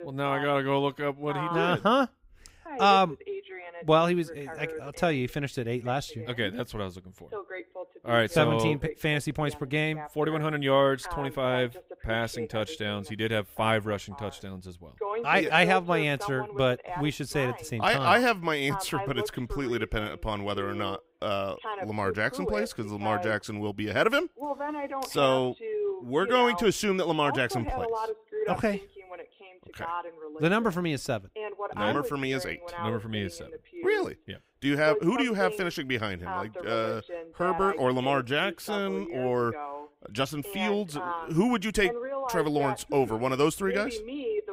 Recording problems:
voice in the background; loud; throughout; 9 dB below the speech

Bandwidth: 15.5 kHz